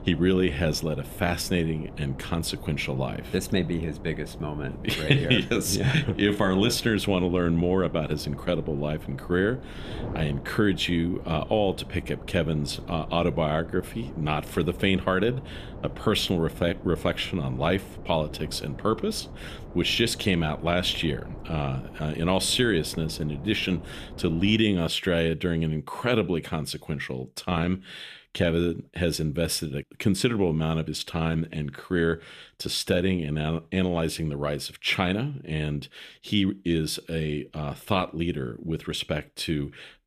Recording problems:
wind noise on the microphone; occasional gusts; until 25 s; 15 dB below the speech

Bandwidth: 14.5 kHz